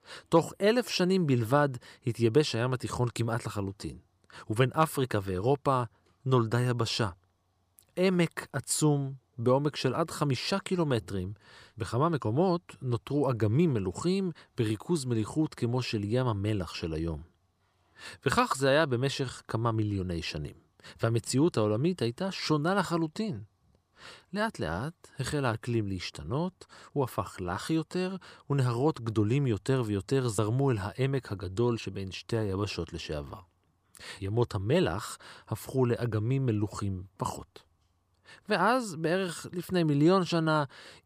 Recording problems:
none

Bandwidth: 15 kHz